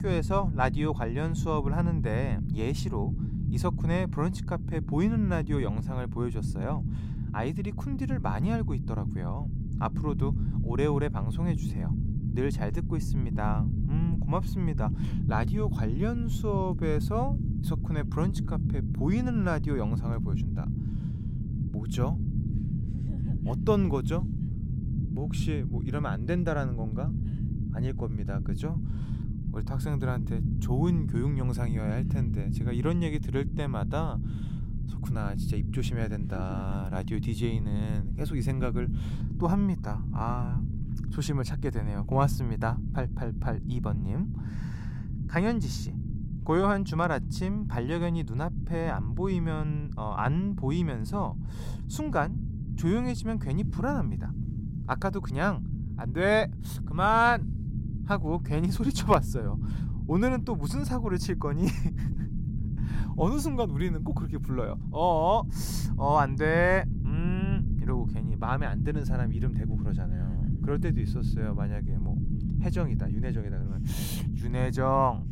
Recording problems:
low rumble; noticeable; throughout; 10 dB below the speech

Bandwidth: 16 kHz